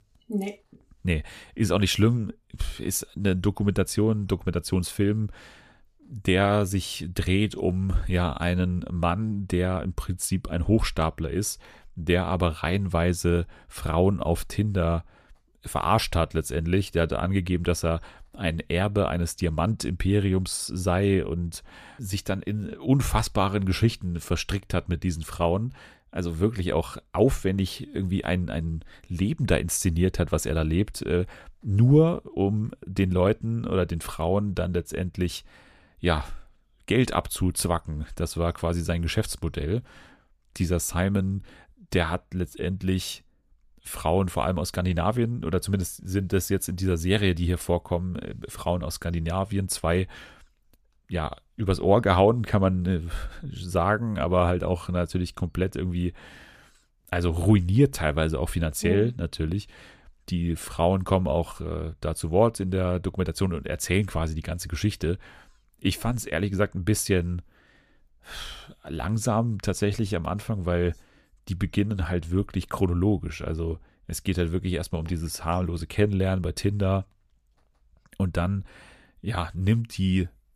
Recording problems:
none

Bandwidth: 14.5 kHz